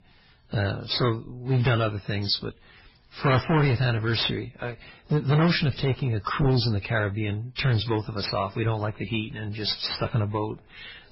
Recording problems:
distortion; heavy; 10% of the sound clipped
garbled, watery; badly; nothing above 5.5 kHz

